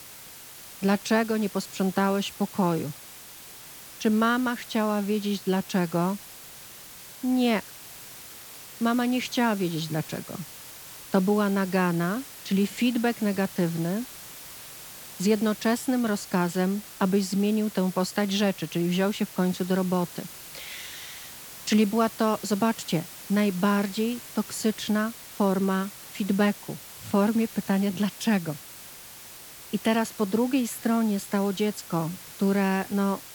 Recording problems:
hiss; noticeable; throughout; 15 dB below the speech

